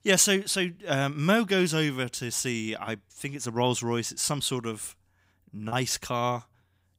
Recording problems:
choppy; occasionally; at 5.5 s; 1% of the speech affected

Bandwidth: 15.5 kHz